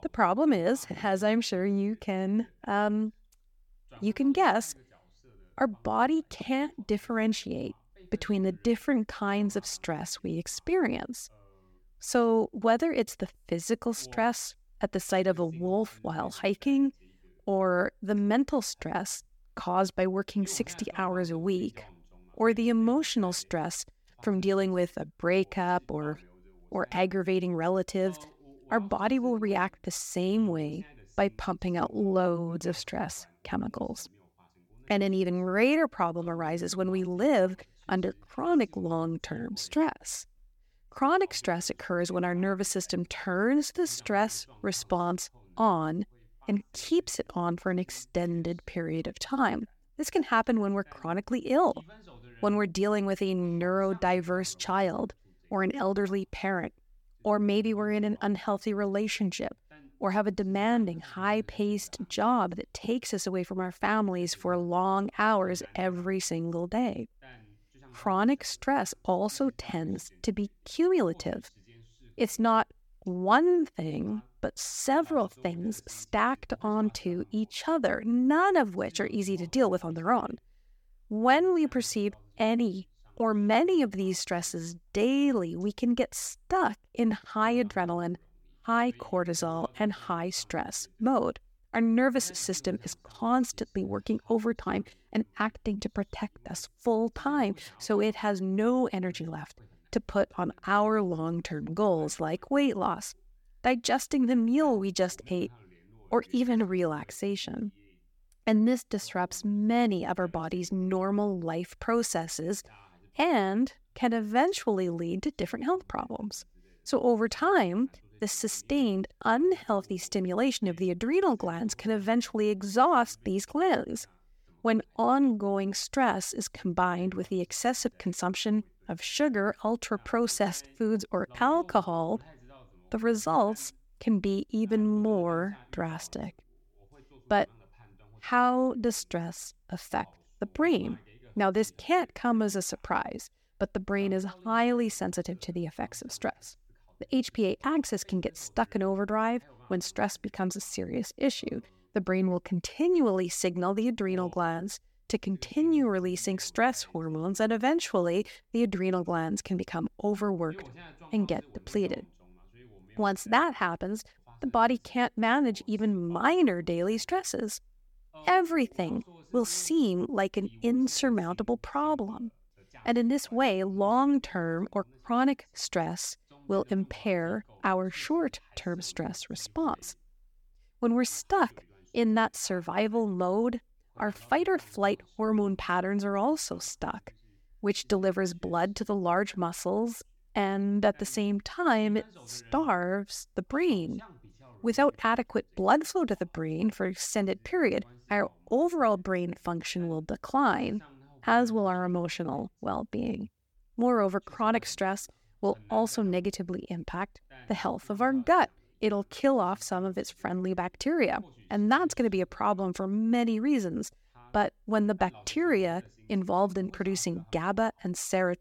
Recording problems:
voice in the background; faint; throughout; 30 dB below the speech

